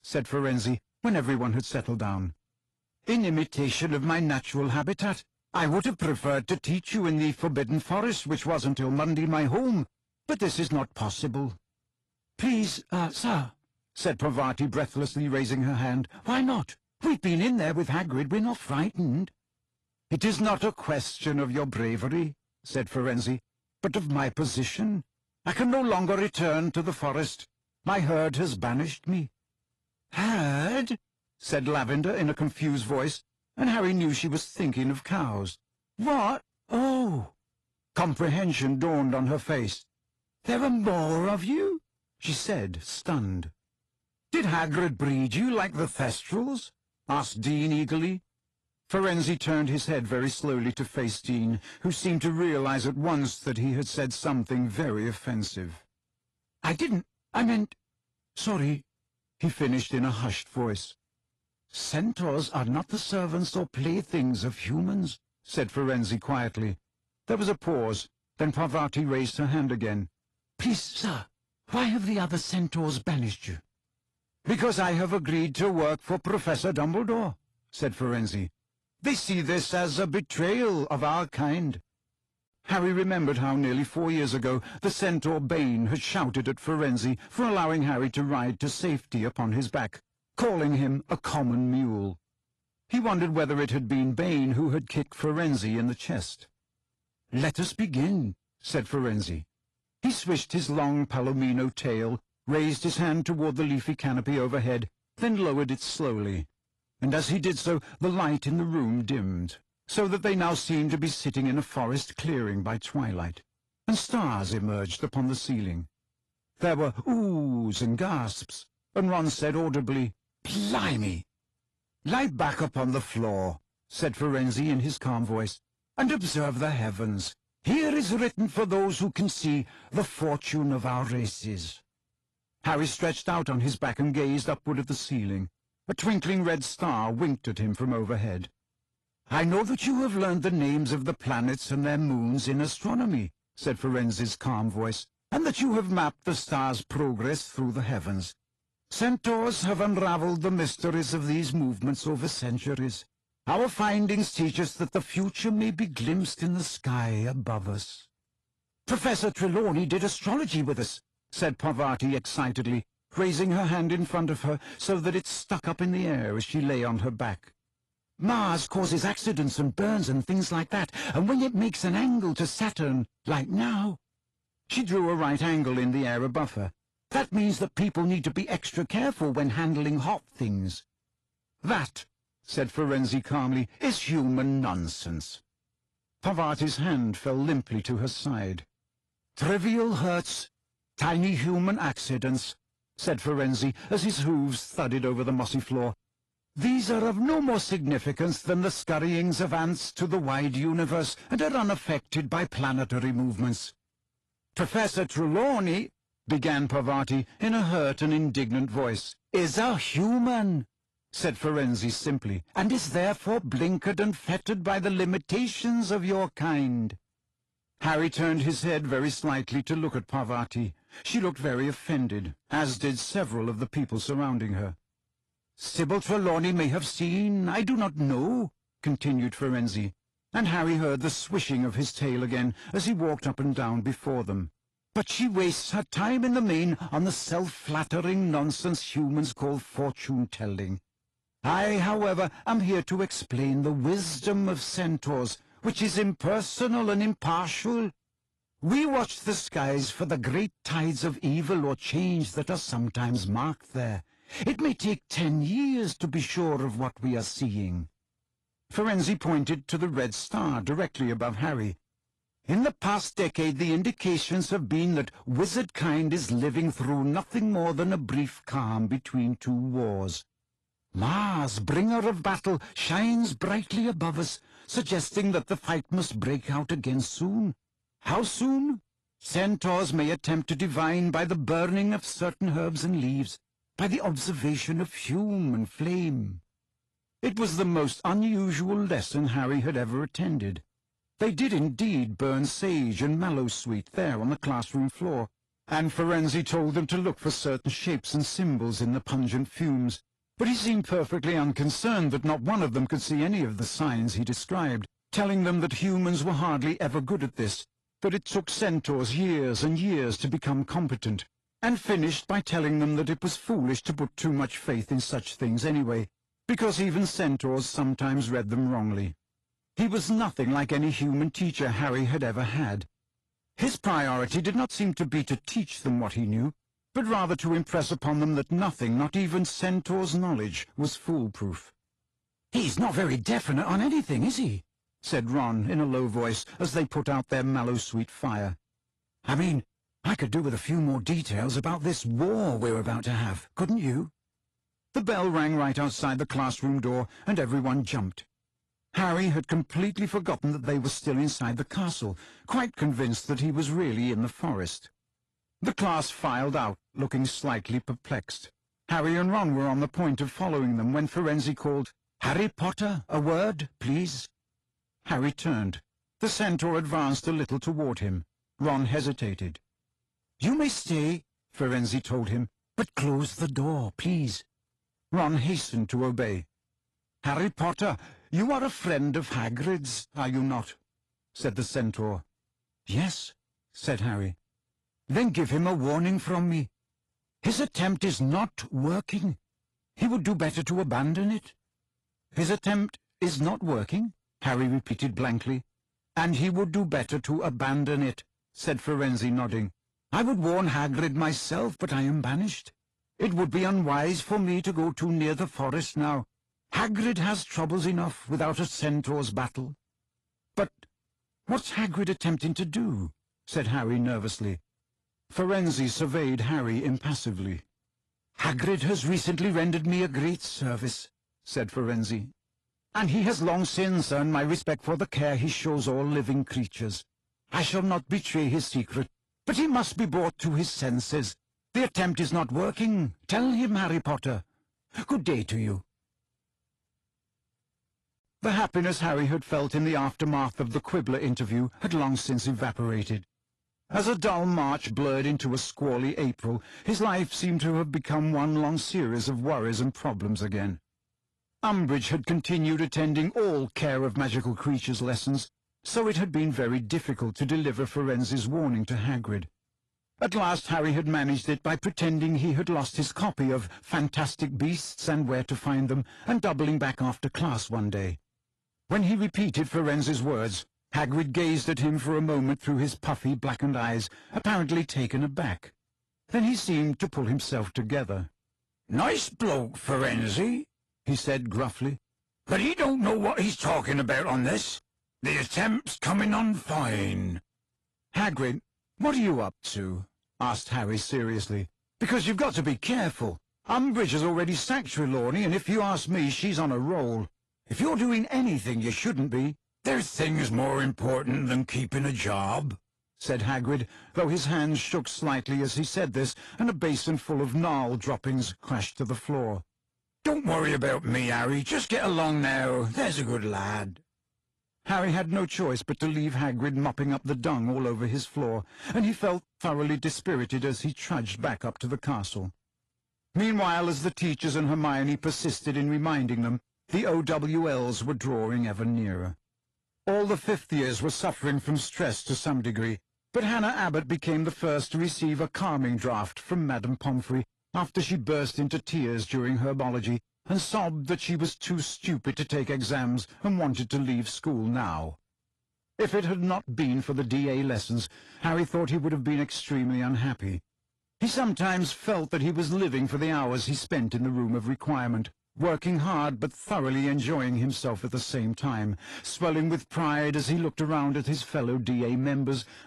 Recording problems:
distortion; slight; 10 dB below the speech
garbled, watery; slightly; nothing above 11 kHz

